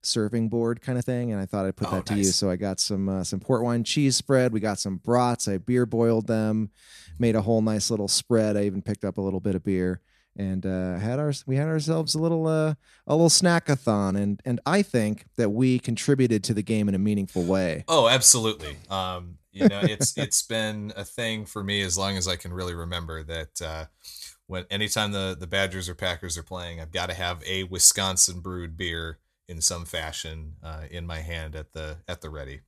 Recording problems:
uneven, jittery; strongly; from 1 to 20 s

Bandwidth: 13.5 kHz